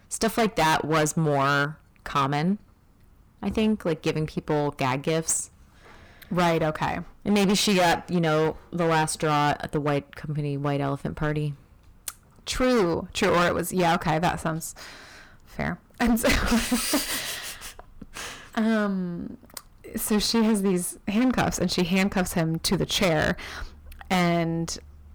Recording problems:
distortion; heavy; 12% of the sound clipped

